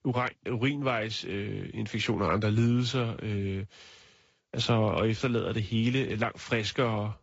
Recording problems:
garbled, watery; slightly; nothing above 7.5 kHz

